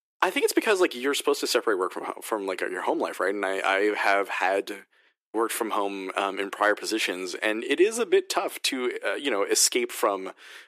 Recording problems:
thin; very; fading below 350 Hz

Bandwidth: 15 kHz